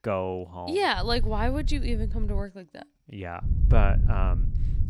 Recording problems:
low rumble; noticeable; from 1 to 2.5 s and from 3.5 s on; 15 dB below the speech

